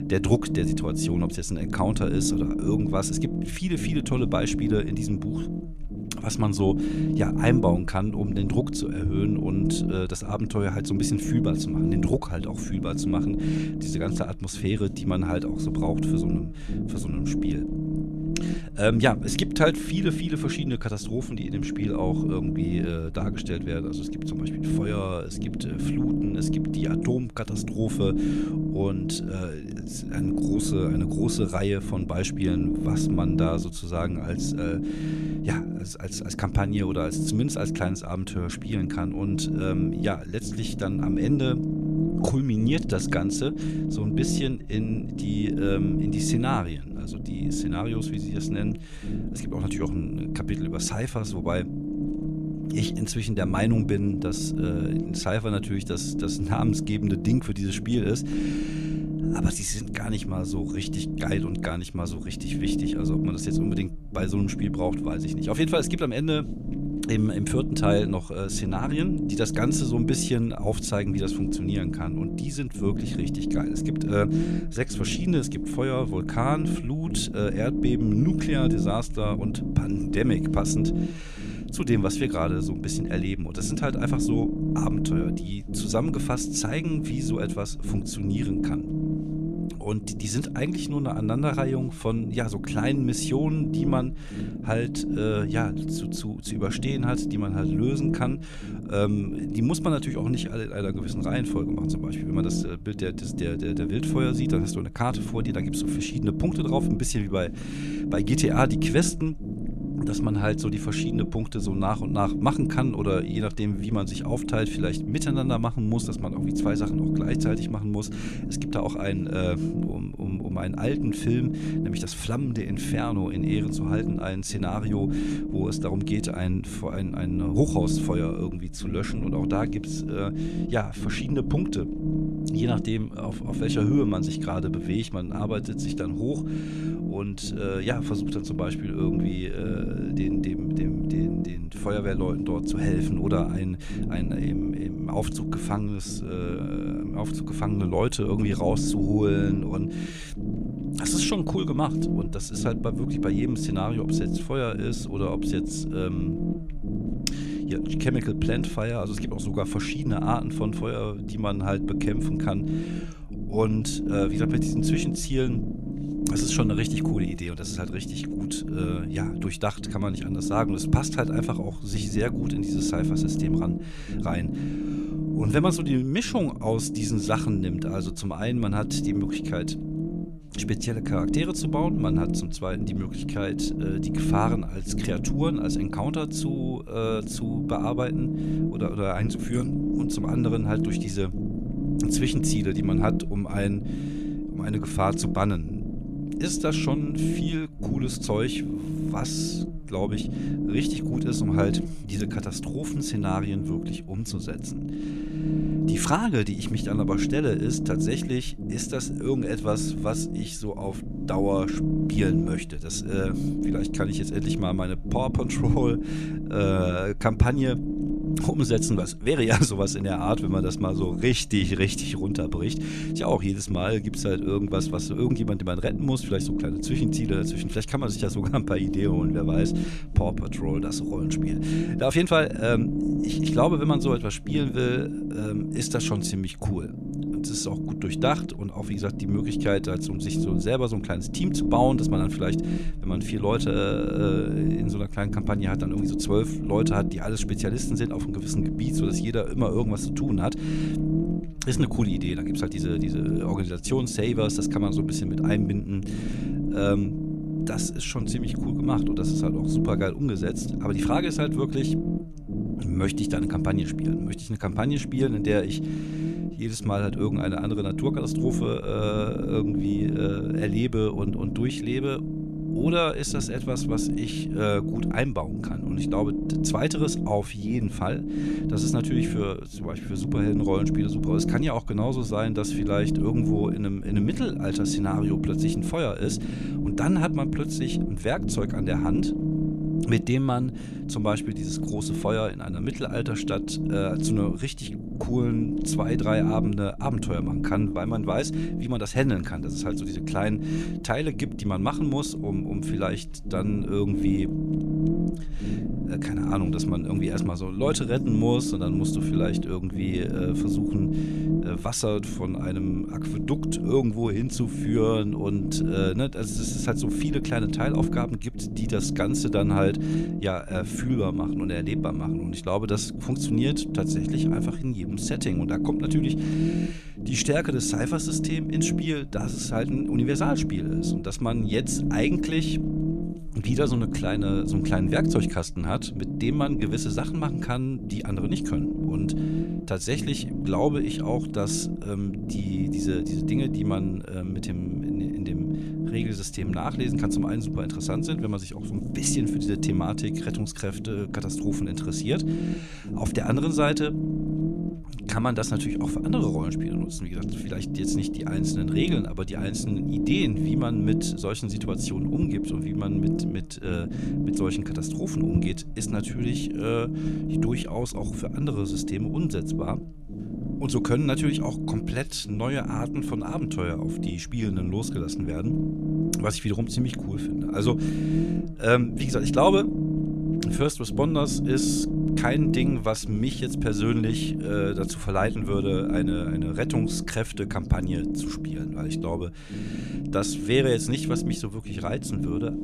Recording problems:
low rumble; loud; throughout; 3 dB below the speech

